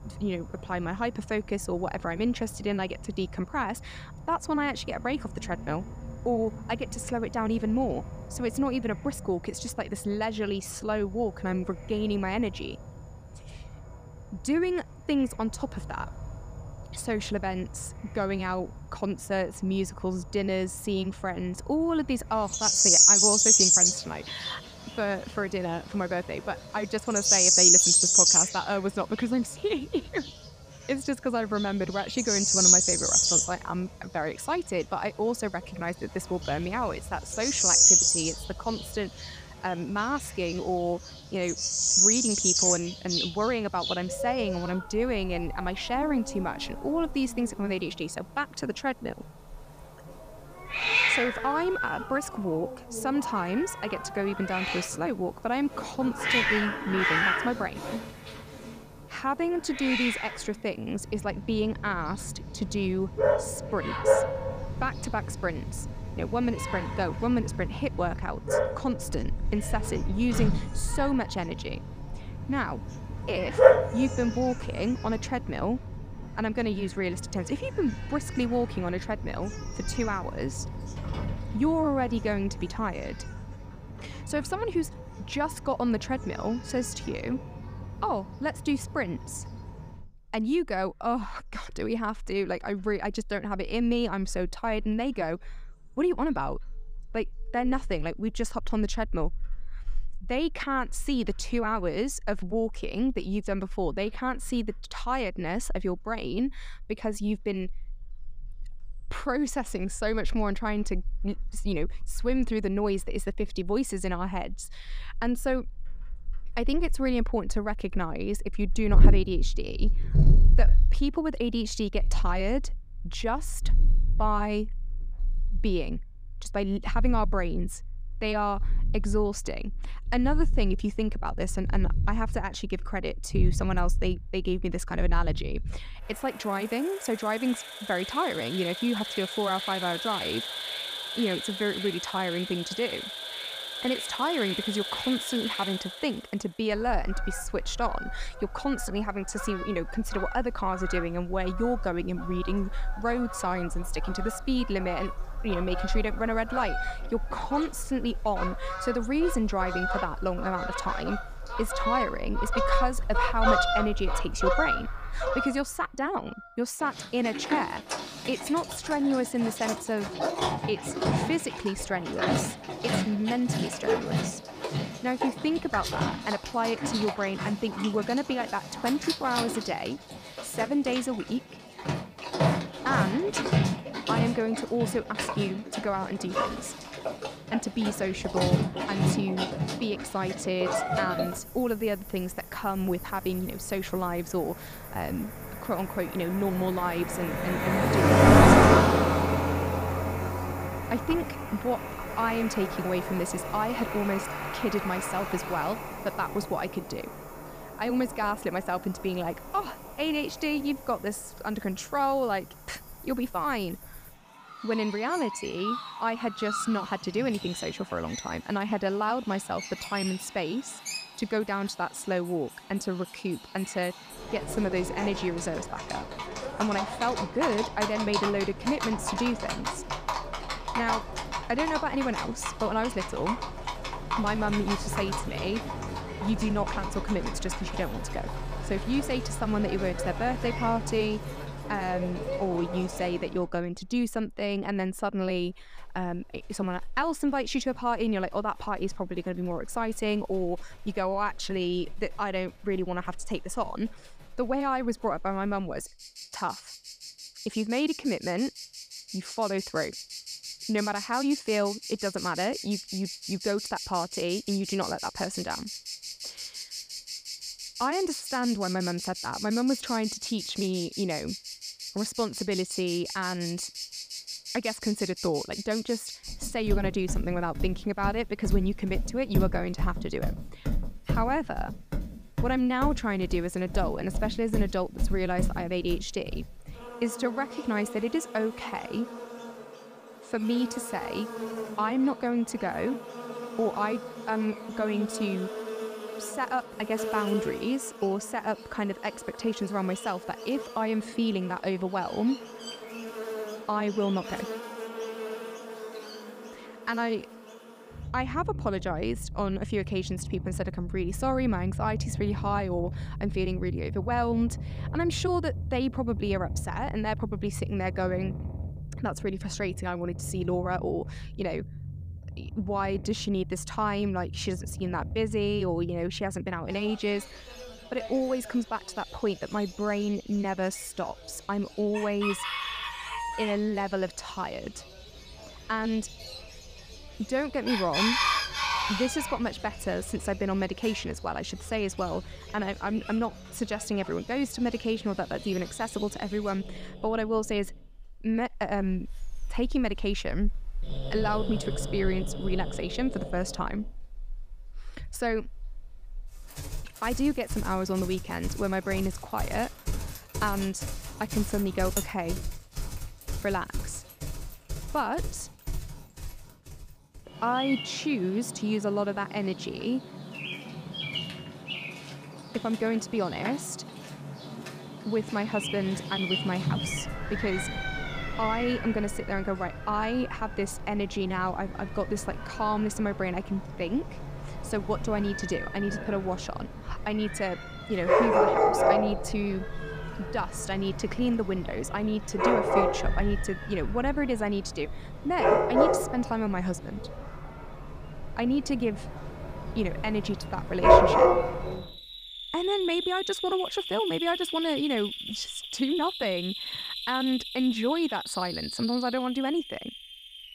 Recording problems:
animal sounds; very loud; throughout; 1 dB above the speech

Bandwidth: 15 kHz